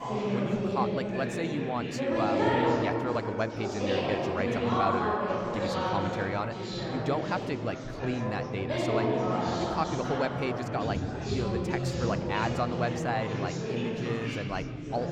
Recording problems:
chatter from many people; very loud; throughout; 3 dB above the speech

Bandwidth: 18 kHz